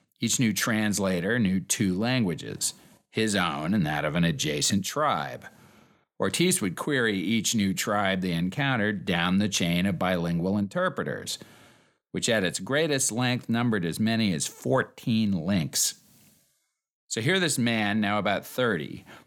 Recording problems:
none

